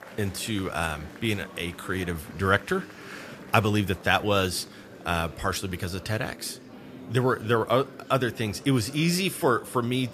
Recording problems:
murmuring crowd; noticeable; throughout; 20 dB below the speech

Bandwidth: 14.5 kHz